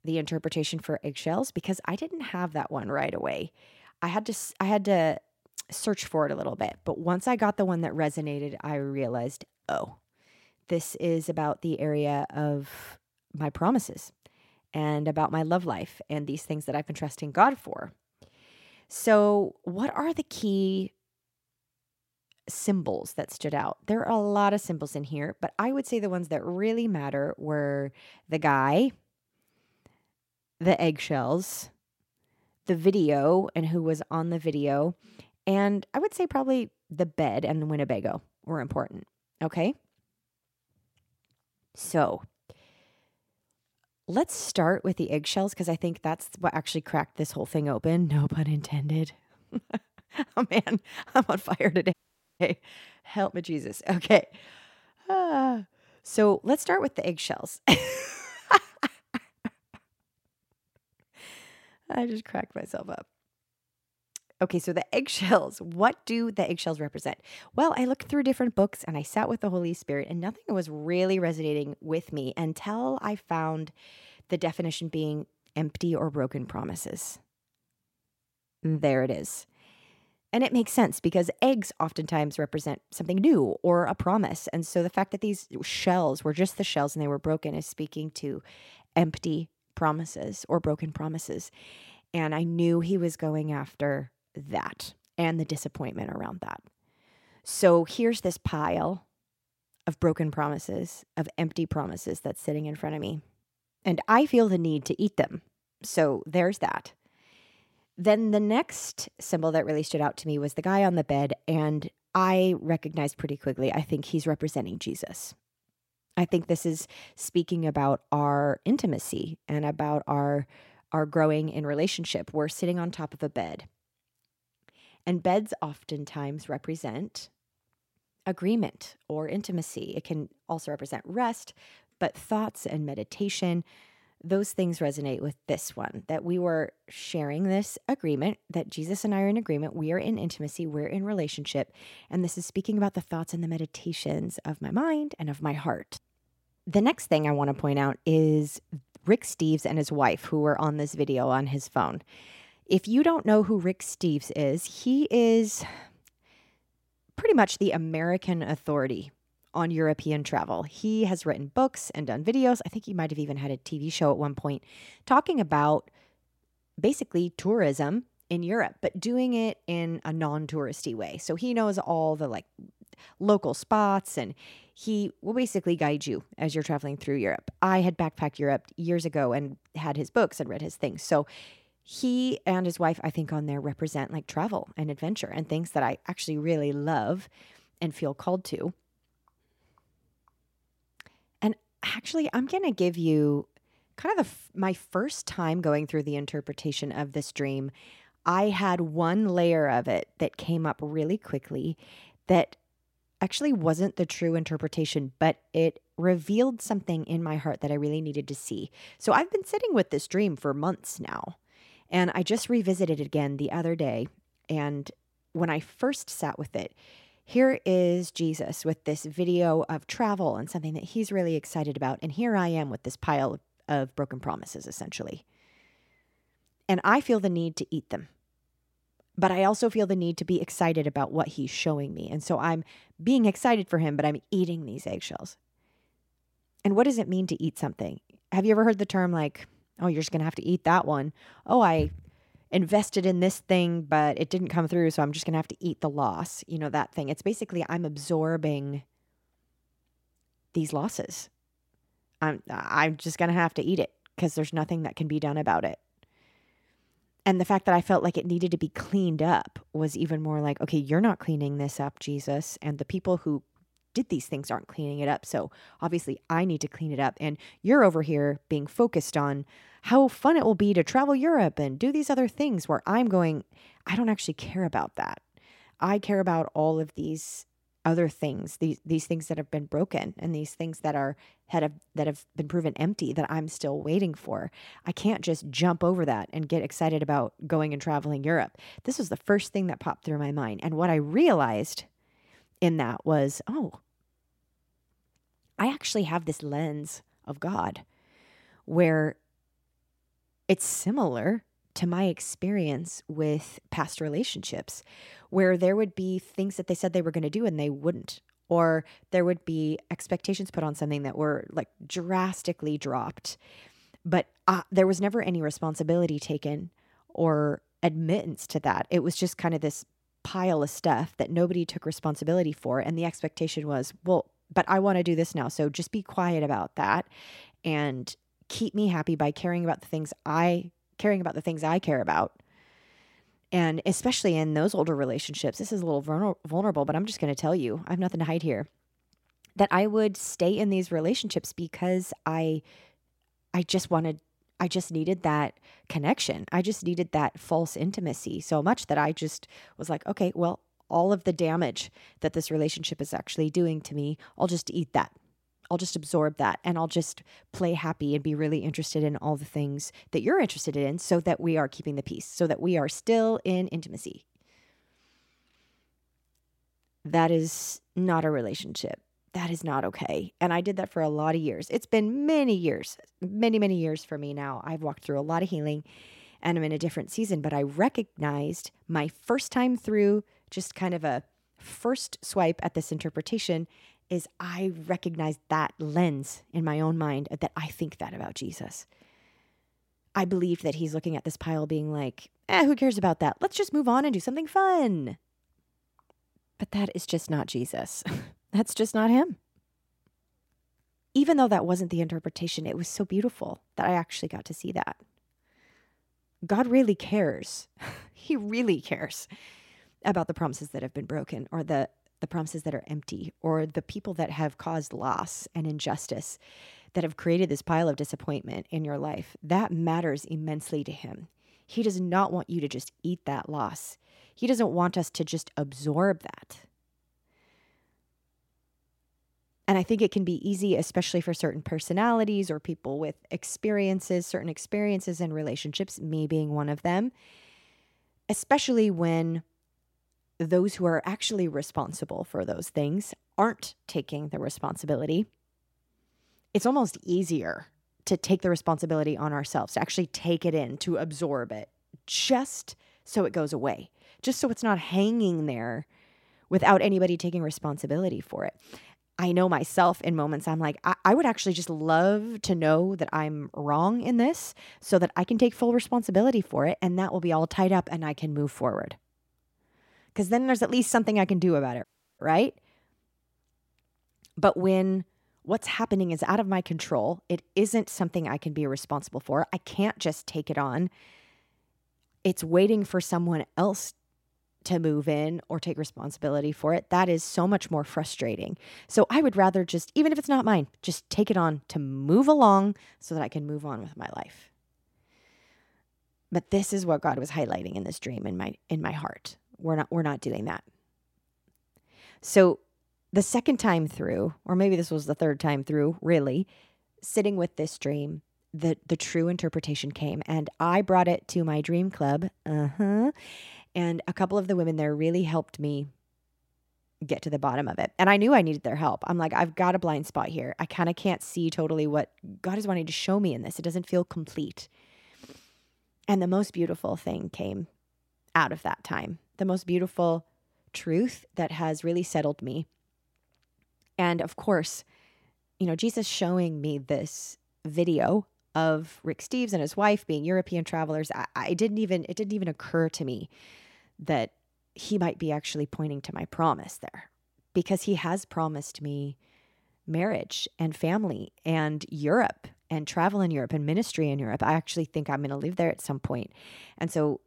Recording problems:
audio cutting out; at 52 s and at 7:52

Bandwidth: 16.5 kHz